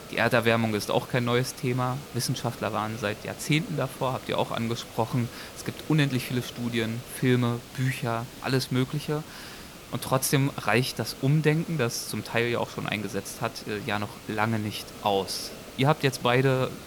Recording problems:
hiss; noticeable; throughout; 15 dB below the speech

